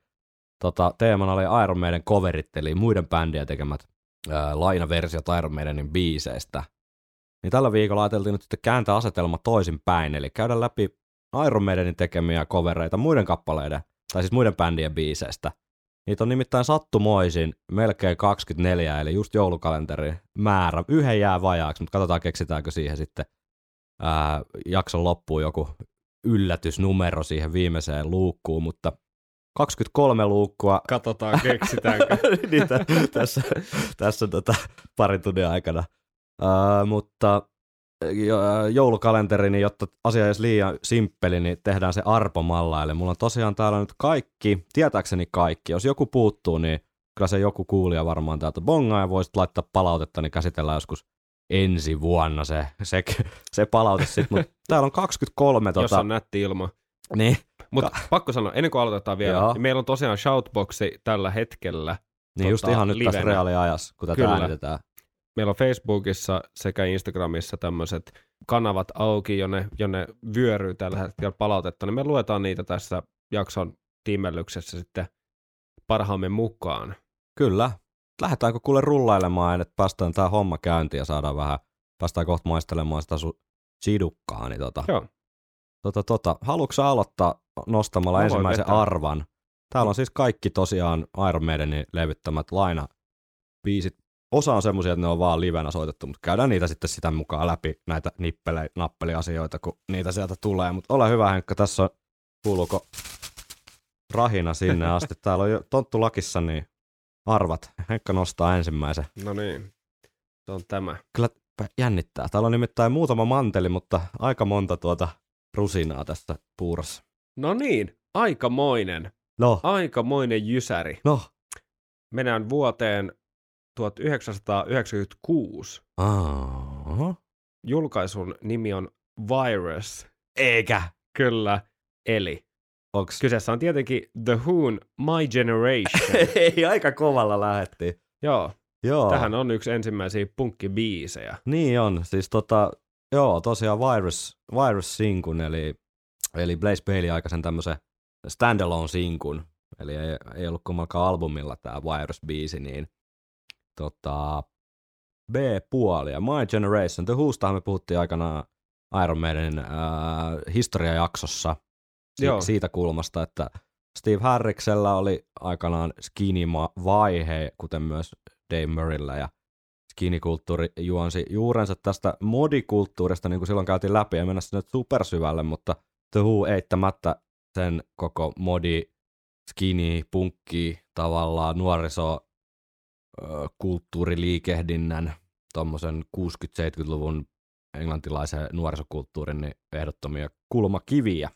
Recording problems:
none

